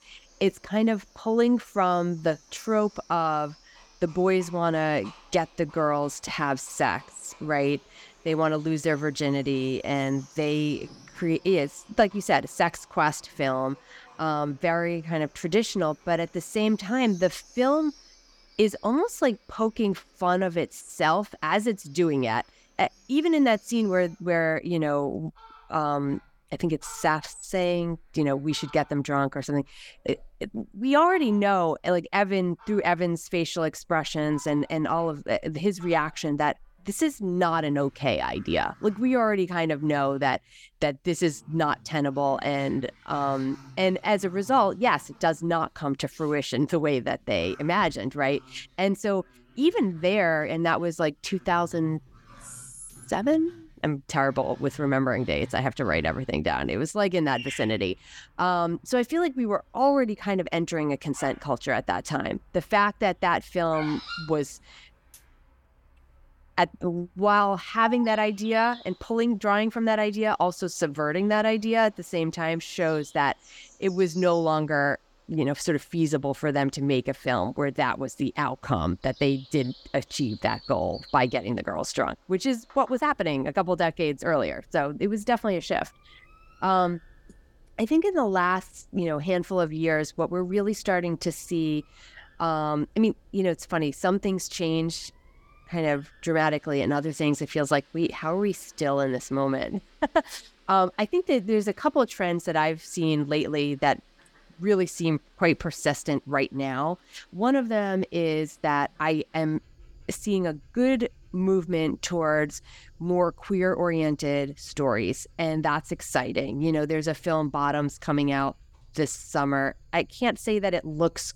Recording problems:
animal sounds; faint; throughout; 25 dB below the speech

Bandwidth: 17.5 kHz